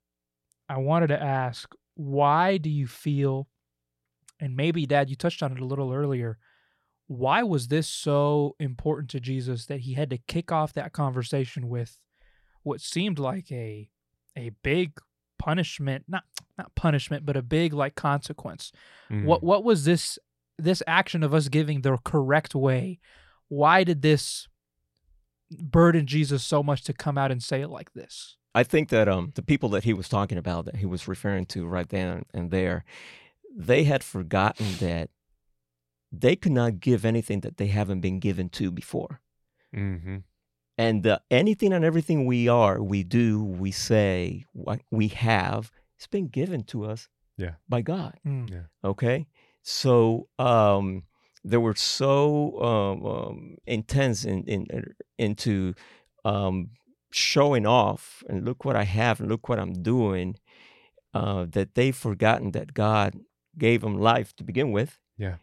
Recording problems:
none

